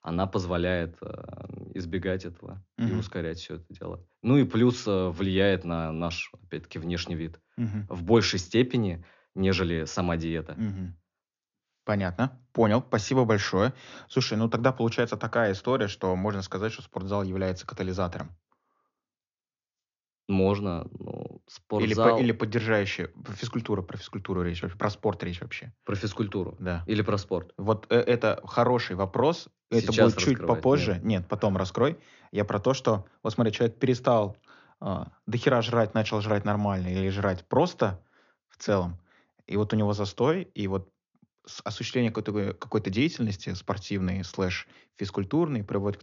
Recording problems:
high frequencies cut off; noticeable; nothing above 7 kHz

